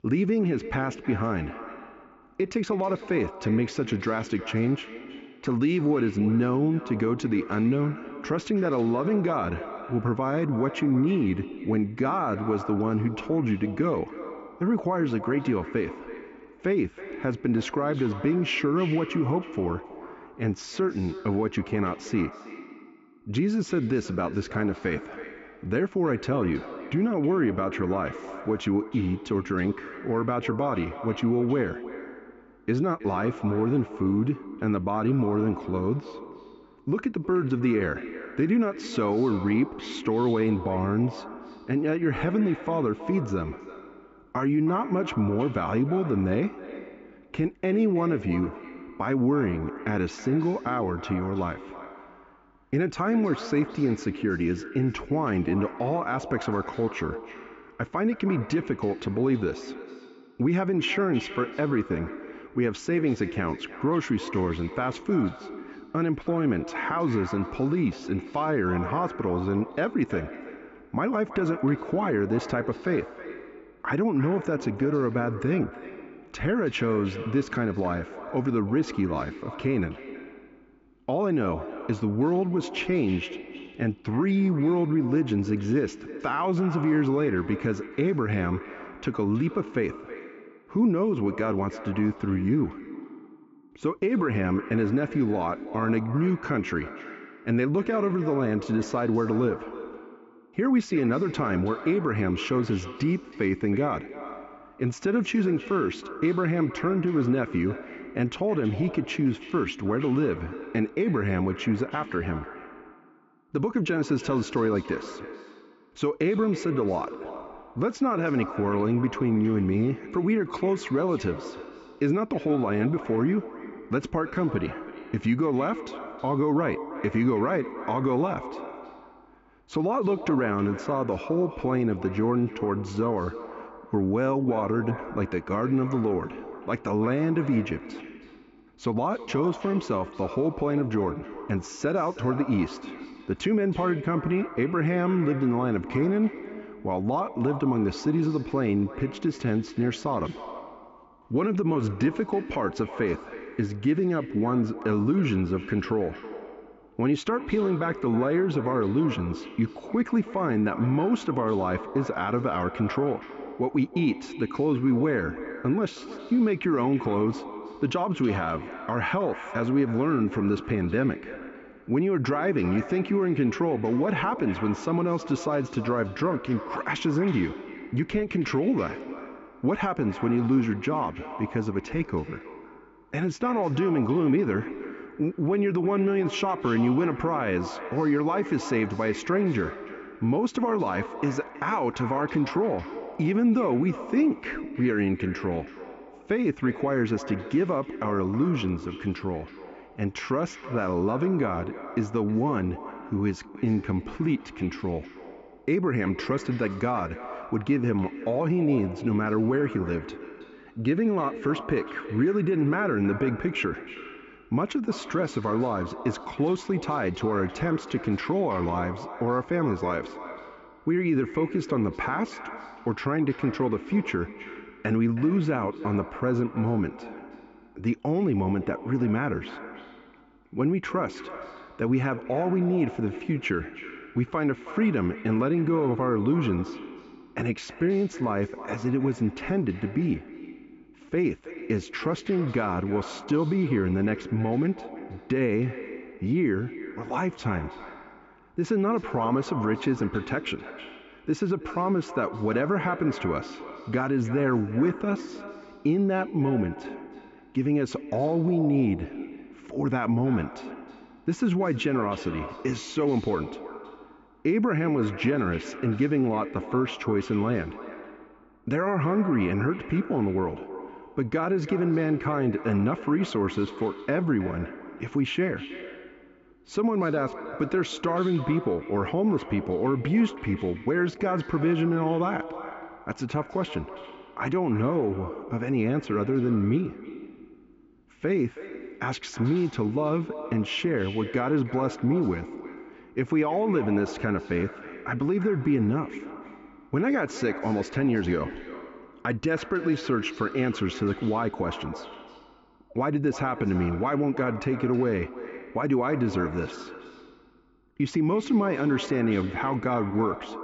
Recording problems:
echo of what is said; noticeable; throughout; 320 ms later, 15 dB below the speech
high frequencies cut off; noticeable; nothing above 8 kHz
muffled; very slightly; fading above 2.5 kHz

